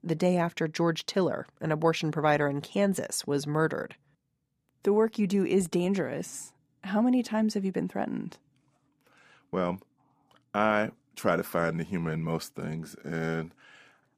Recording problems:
none

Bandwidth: 15 kHz